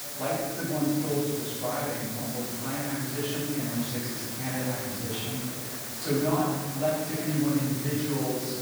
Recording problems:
room echo; strong; dies away in 1.4 s
off-mic speech; far
hiss; loud; throughout; 3 dB below the speech
murmuring crowd; noticeable; throughout; 15 dB below the speech

